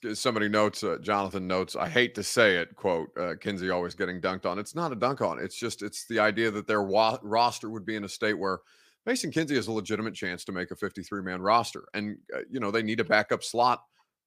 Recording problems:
none

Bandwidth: 15 kHz